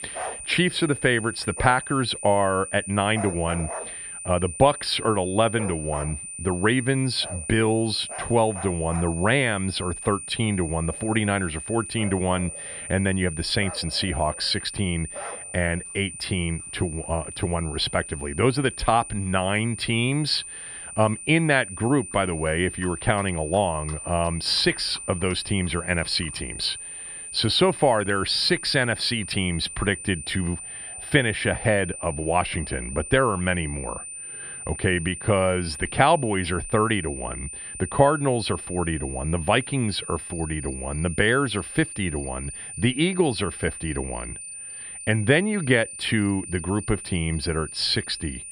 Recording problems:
high-pitched whine; loud; throughout; 9 kHz, 10 dB below the speech
animal sounds; noticeable; throughout; 20 dB below the speech

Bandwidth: 14.5 kHz